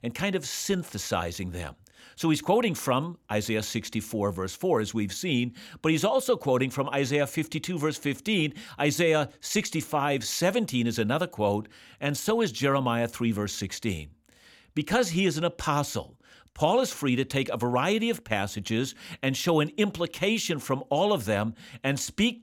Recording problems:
none

